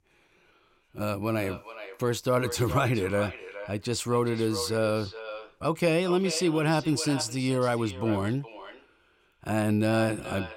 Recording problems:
echo of what is said; noticeable; throughout; 420 ms later, 15 dB below the speech

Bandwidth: 16 kHz